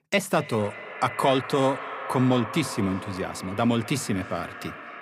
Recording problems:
echo of what is said; strong; throughout; 250 ms later, 10 dB below the speech

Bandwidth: 15 kHz